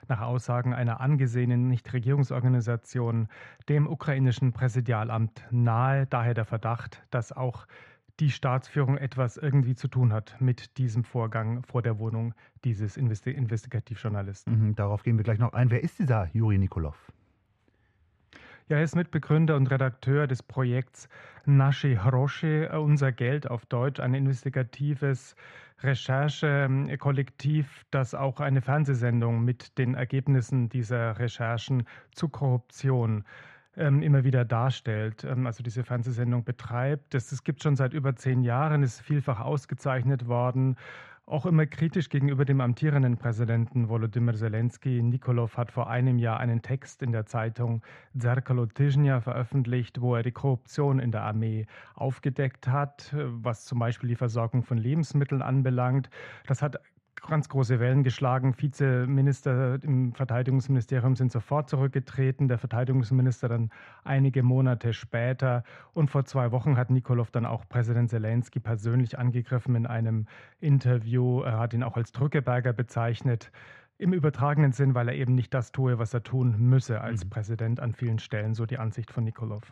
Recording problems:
muffled; very; fading above 2.5 kHz

